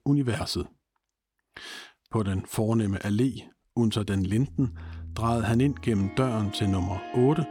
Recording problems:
background music; noticeable; from 4.5 s on; 15 dB below the speech

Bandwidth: 17 kHz